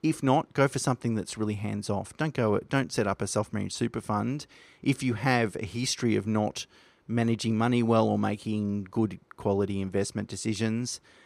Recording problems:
none

